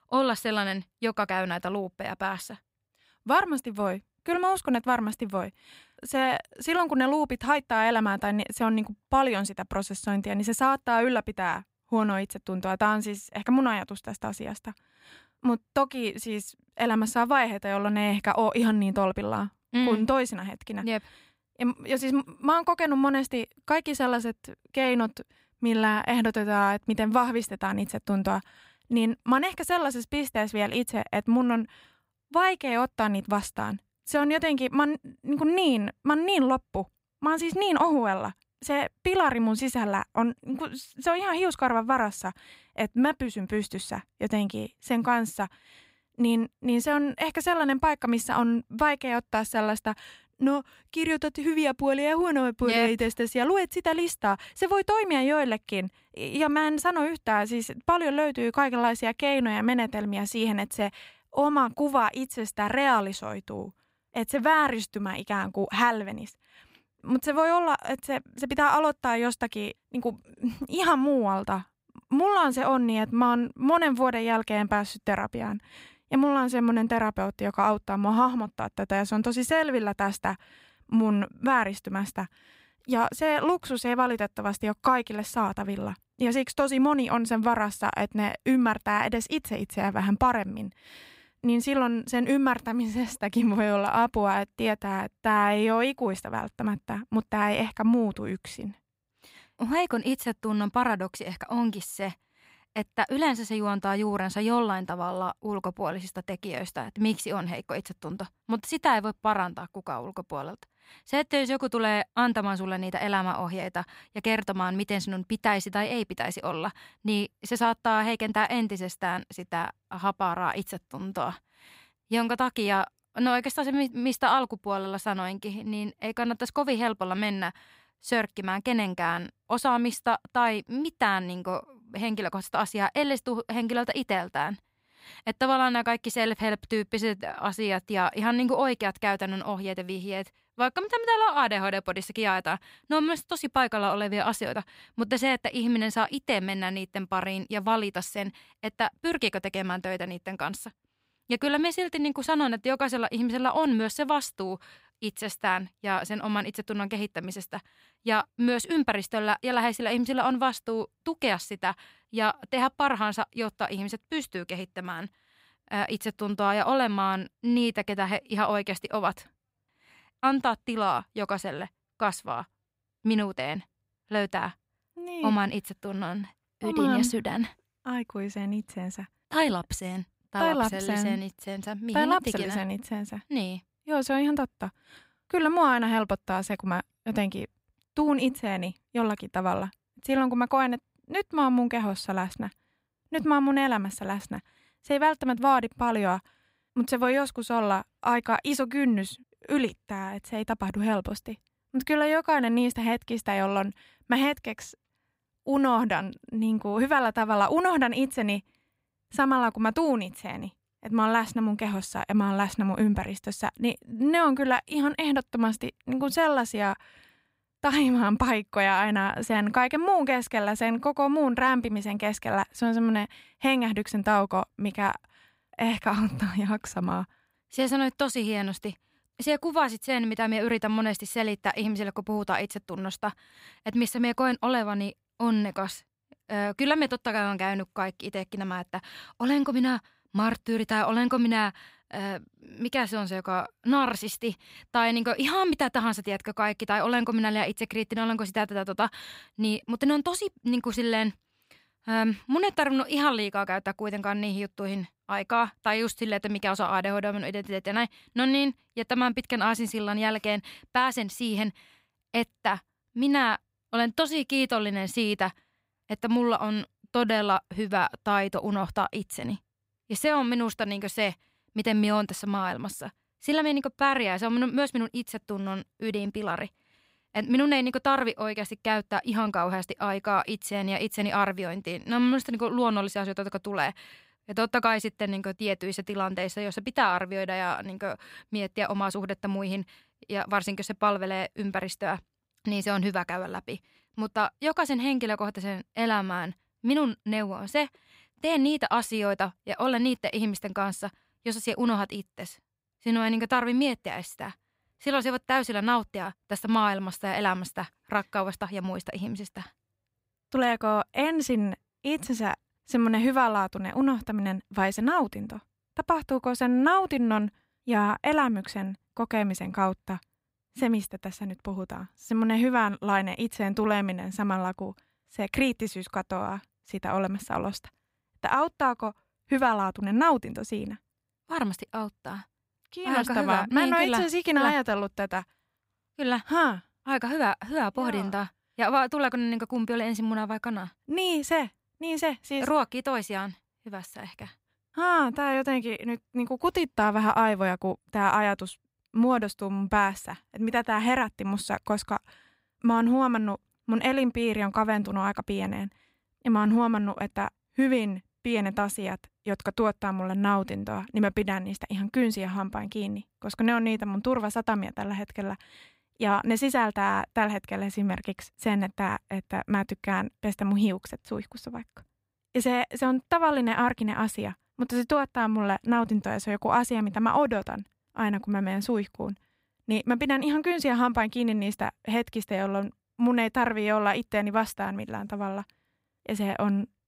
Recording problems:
none

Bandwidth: 15.5 kHz